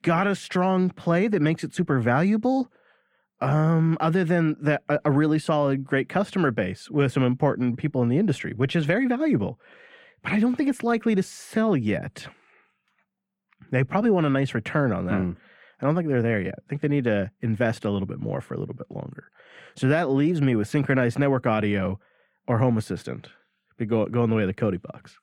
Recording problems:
muffled; very; fading above 3.5 kHz

